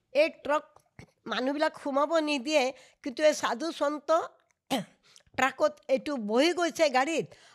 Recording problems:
none

